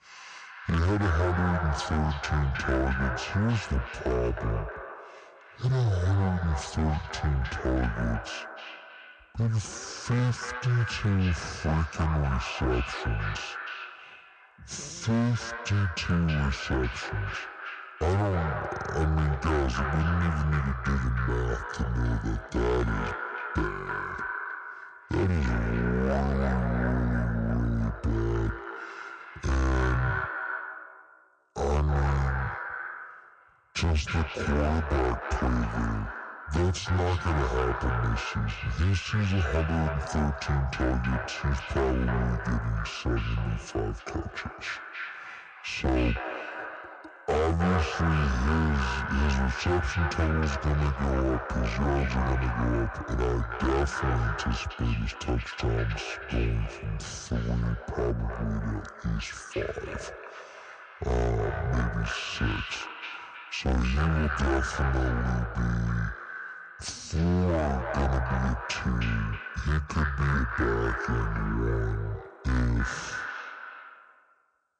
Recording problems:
echo of what is said; strong; throughout; 310 ms later, 7 dB below the speech
wrong speed and pitch; too slow and too low; 0.6 times normal speed
distortion; slight; 10% of the sound clipped

